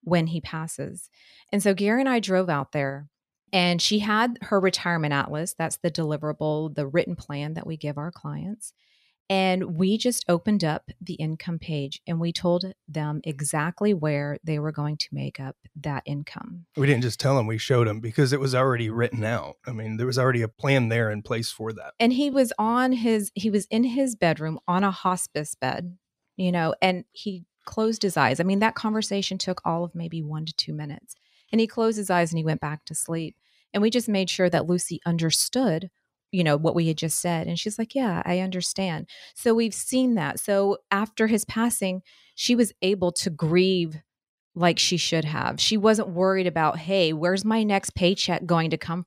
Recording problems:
none

